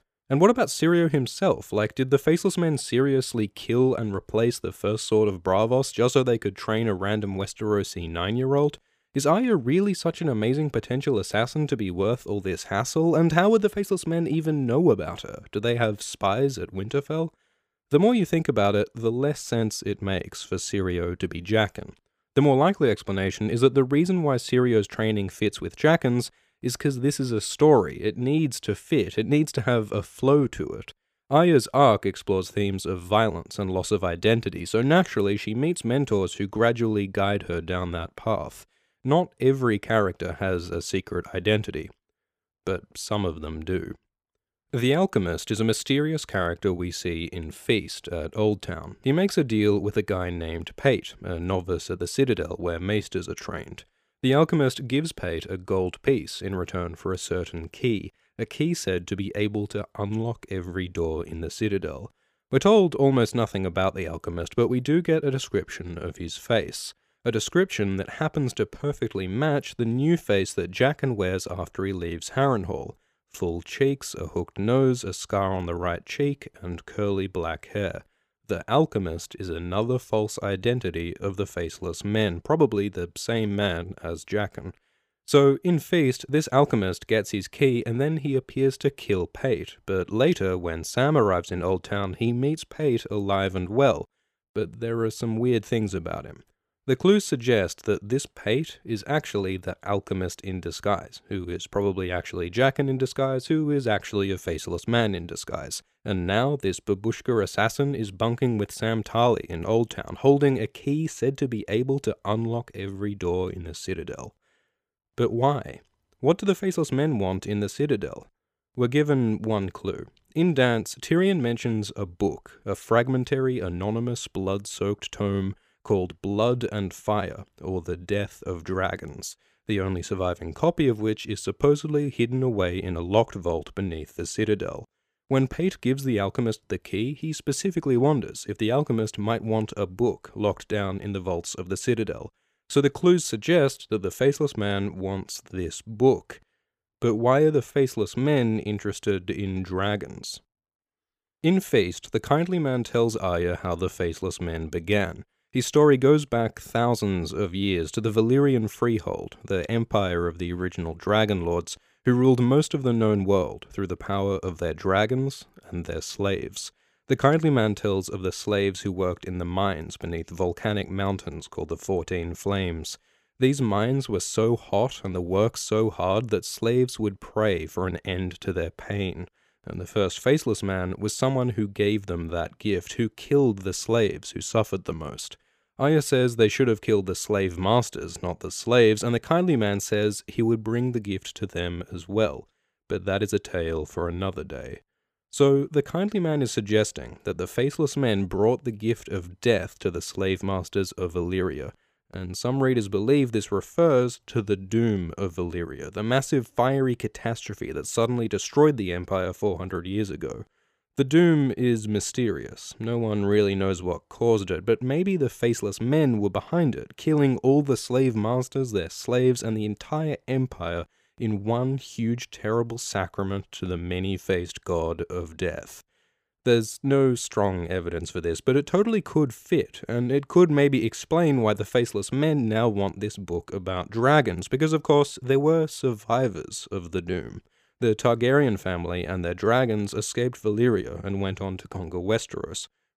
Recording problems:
none

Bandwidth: 15 kHz